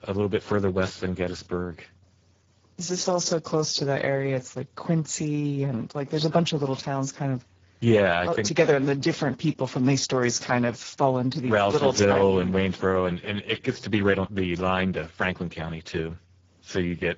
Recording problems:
garbled, watery; badly
high frequencies cut off; noticeable; nothing above 7.5 kHz

